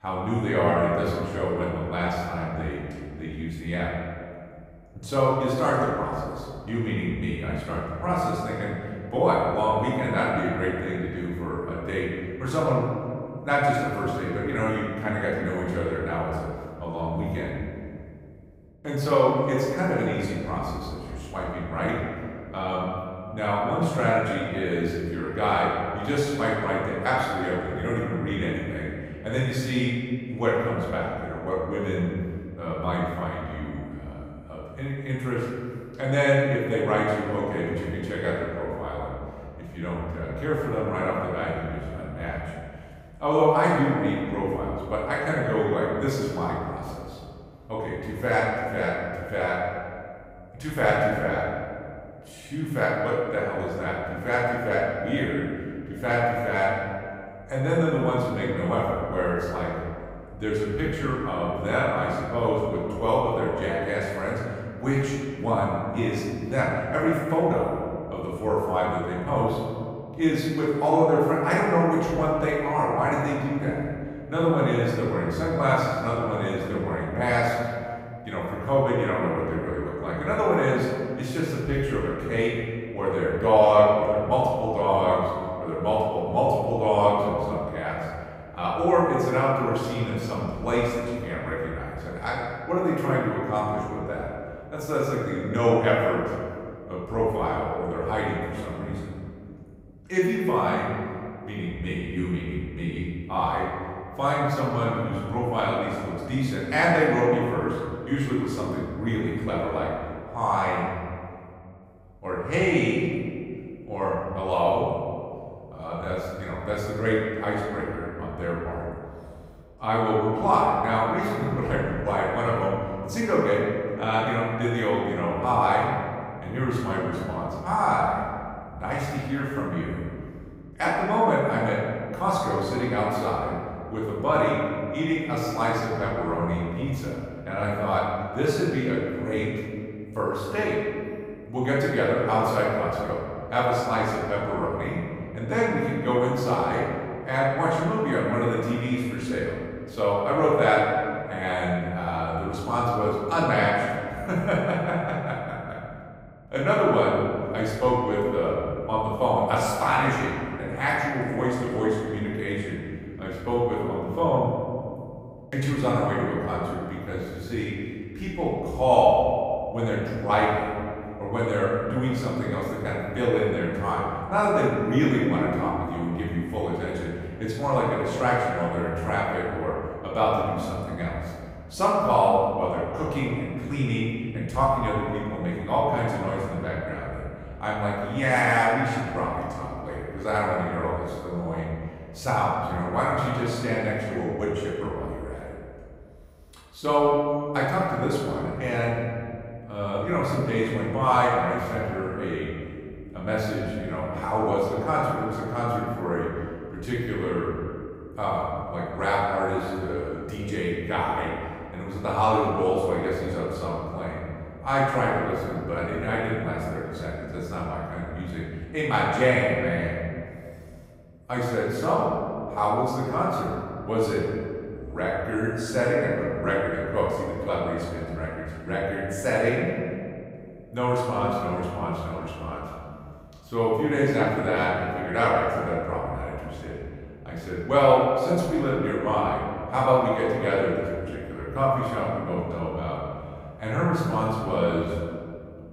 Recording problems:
room echo; strong; dies away in 2.1 s
off-mic speech; far

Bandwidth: 15.5 kHz